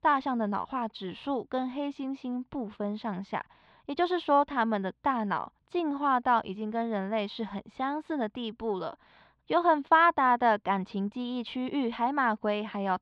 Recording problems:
muffled; slightly; fading above 3.5 kHz

